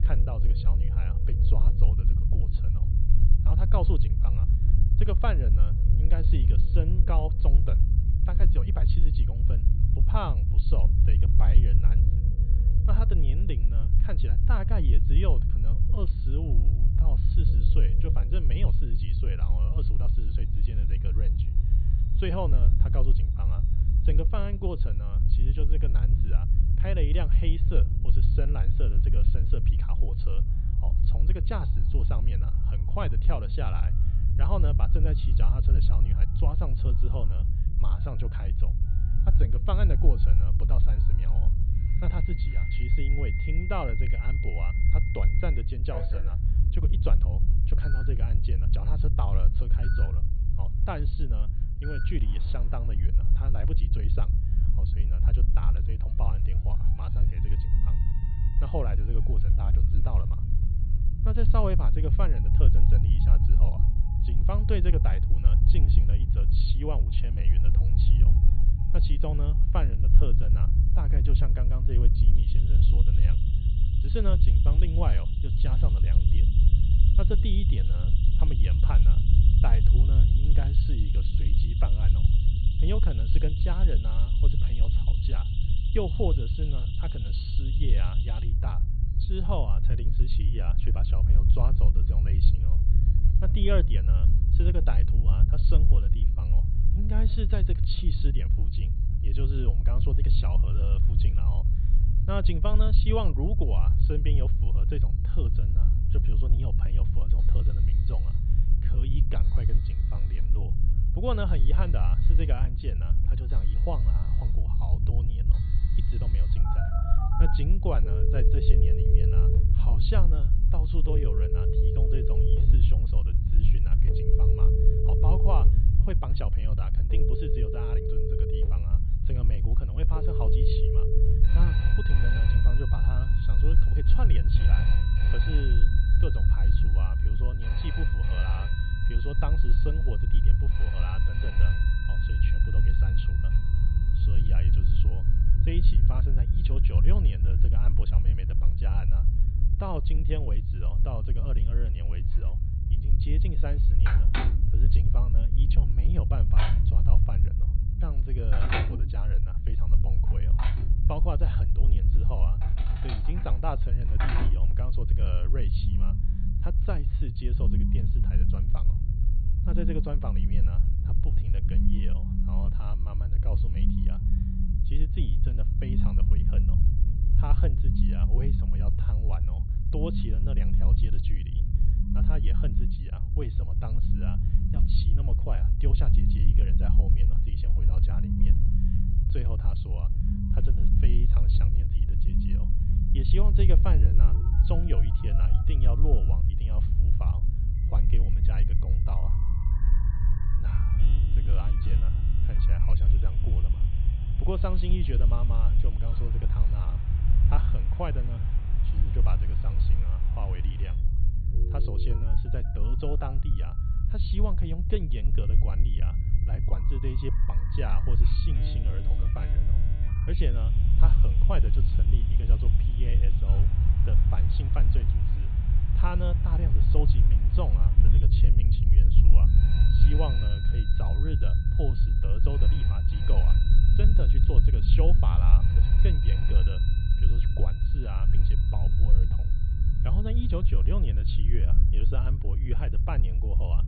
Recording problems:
high frequencies cut off; severe; nothing above 4.5 kHz
alarms or sirens; loud; throughout; 4 dB below the speech
low rumble; loud; throughout; 3 dB below the speech

